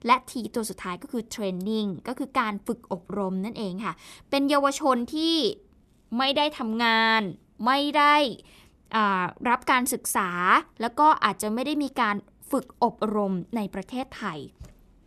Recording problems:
none

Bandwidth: 13.5 kHz